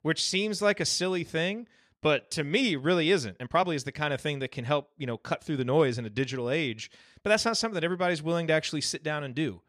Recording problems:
uneven, jittery; slightly; from 2 to 6 s

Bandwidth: 14 kHz